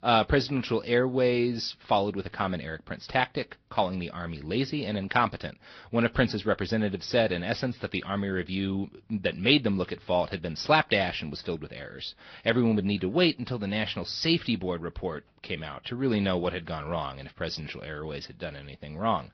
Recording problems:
high frequencies cut off; noticeable; nothing above 5.5 kHz
garbled, watery; slightly

